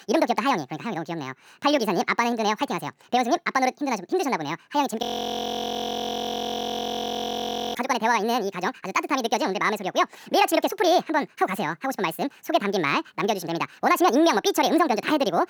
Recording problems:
wrong speed and pitch; too fast and too high; 1.7 times normal speed
audio freezing; at 5 s for 2.5 s

